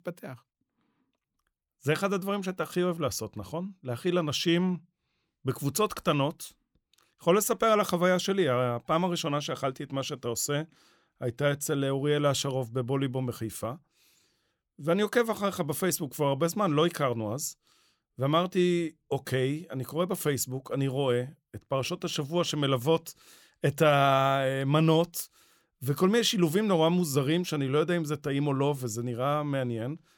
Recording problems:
none

